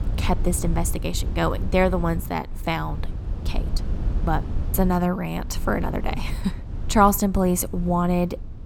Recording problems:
low rumble; noticeable; throughout; 20 dB below the speech

